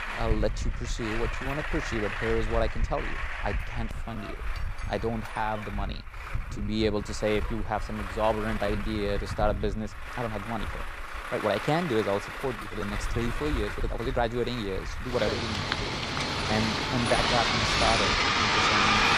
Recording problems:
traffic noise; very loud; throughout; 1 dB above the speech
uneven, jittery; strongly; from 1.5 to 19 s

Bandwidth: 15 kHz